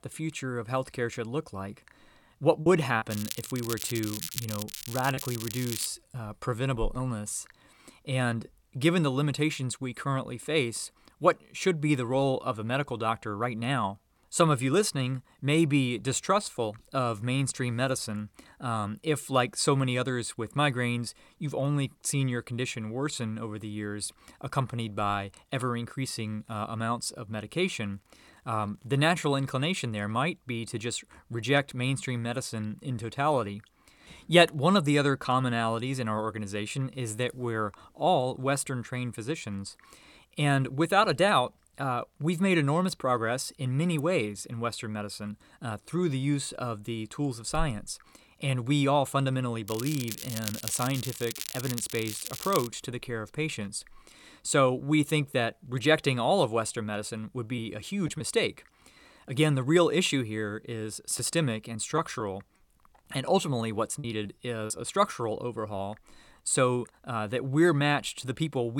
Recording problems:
crackling; loud; from 3 to 6 s and from 50 to 53 s; 8 dB below the speech
choppy; occasionally; from 2.5 to 7 s and from 1:01 to 1:05; 4% of the speech affected
abrupt cut into speech; at the end

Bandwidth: 17.5 kHz